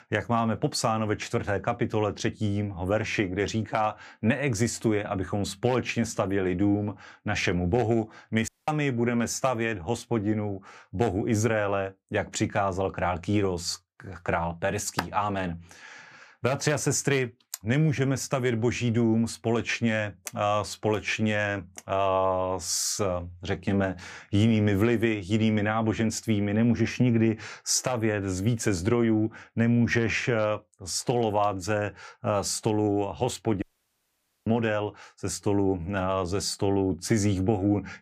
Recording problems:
audio cutting out; at 8.5 s and at 34 s for 1 s

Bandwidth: 15 kHz